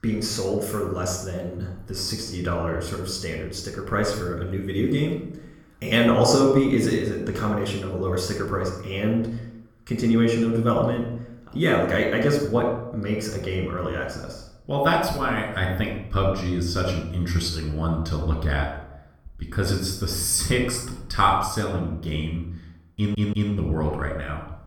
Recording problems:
room echo; noticeable; dies away in 0.6 s
off-mic speech; somewhat distant
audio stuttering; at 23 s

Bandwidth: 18.5 kHz